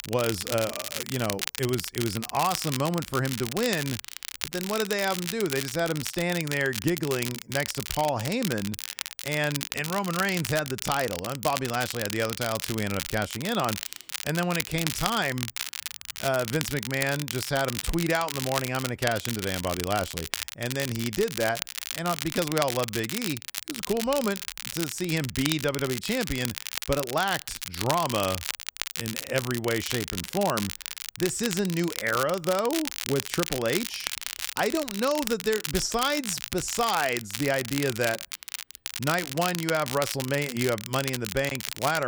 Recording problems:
crackle, like an old record; loud; 5 dB below the speech
abrupt cut into speech; at the end

